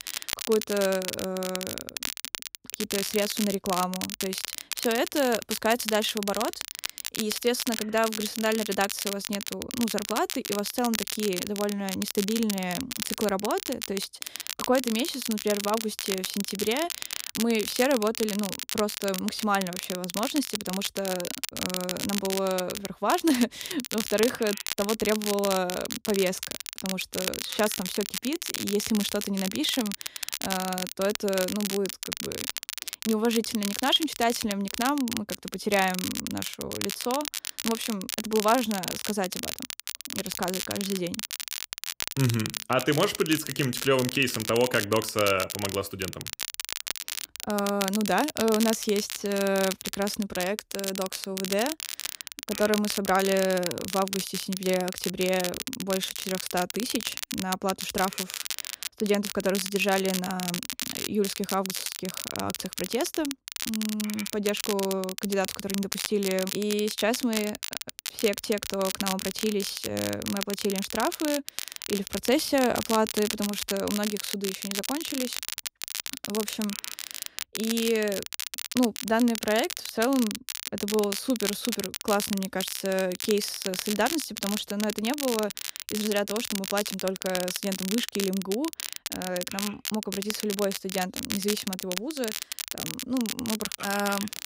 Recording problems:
crackle, like an old record; loud; 4 dB below the speech

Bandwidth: 15.5 kHz